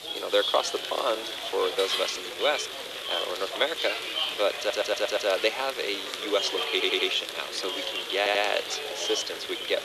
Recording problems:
thin; very; fading below 450 Hz
household noises; loud; throughout; 7 dB below the speech
murmuring crowd; loud; throughout; 3 dB below the speech
hiss; noticeable; throughout; 20 dB below the speech
audio stuttering; at 4.5 s, at 6.5 s and at 8 s

